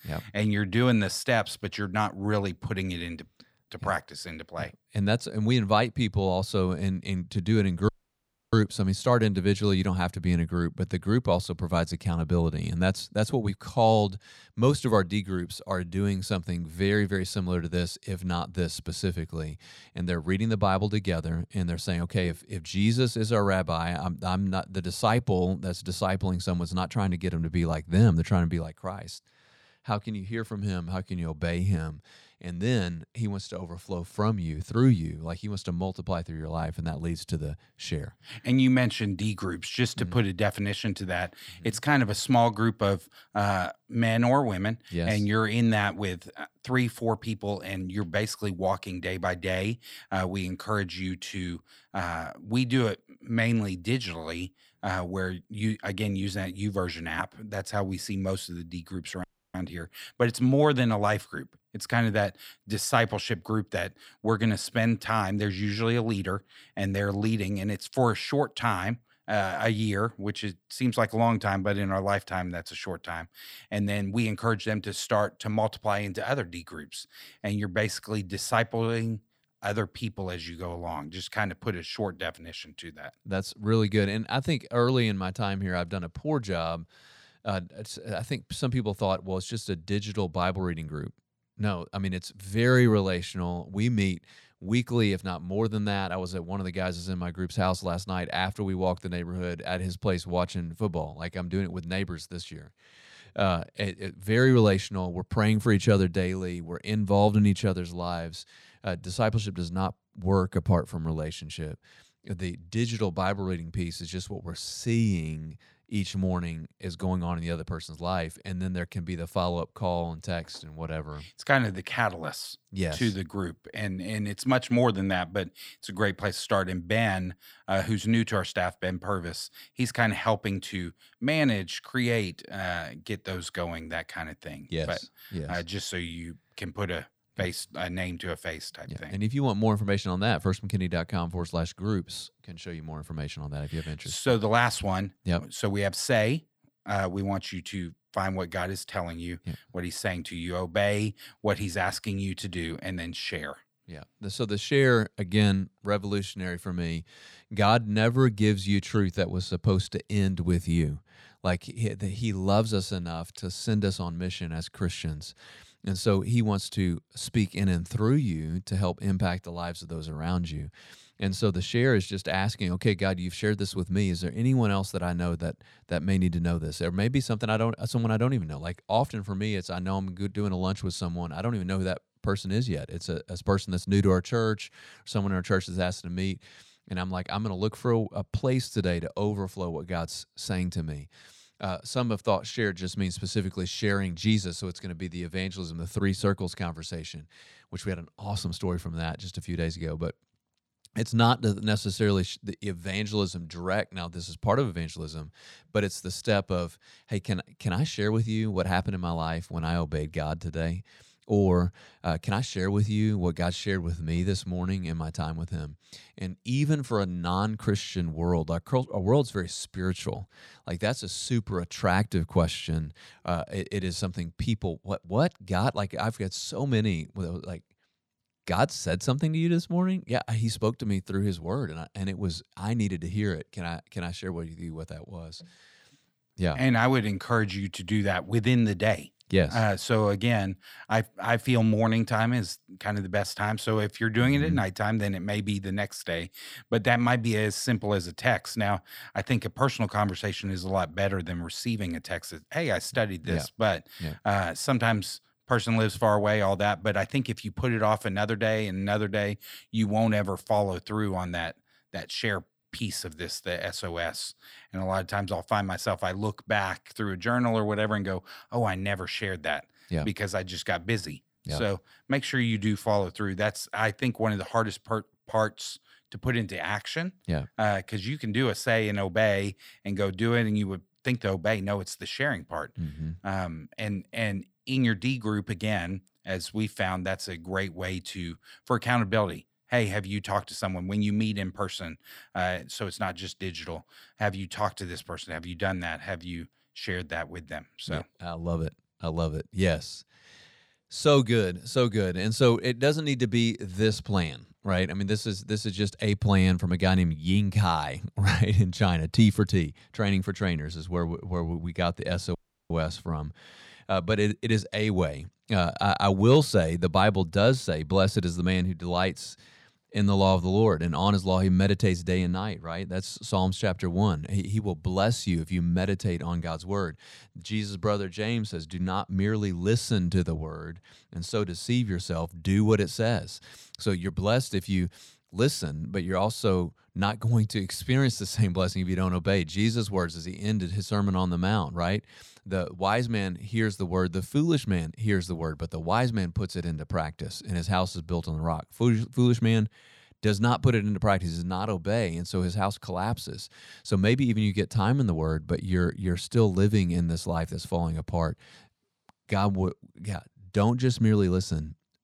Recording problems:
audio cutting out; at 8 s for 0.5 s, at 59 s and at 5:12

